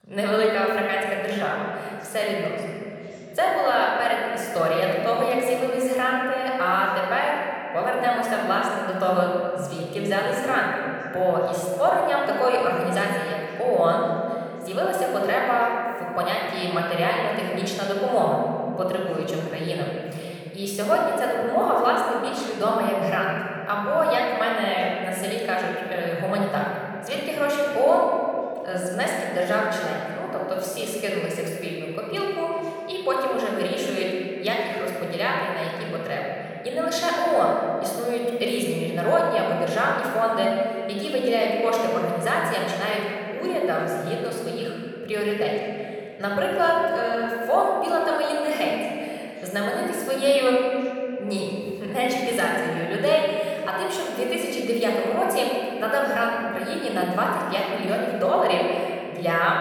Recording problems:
room echo; strong; dies away in 2.7 s
off-mic speech; somewhat distant
voice in the background; faint; throughout; 30 dB below the speech

